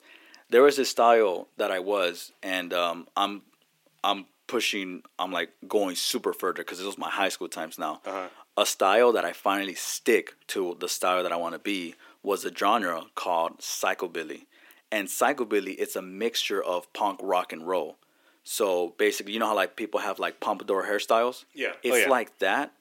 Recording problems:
thin; somewhat; fading below 300 Hz

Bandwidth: 16.5 kHz